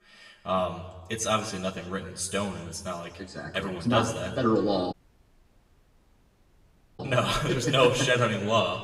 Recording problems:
room echo; slight; dies away in 1.2 s
off-mic speech; somewhat distant
audio cutting out; at 5 s for 2 s

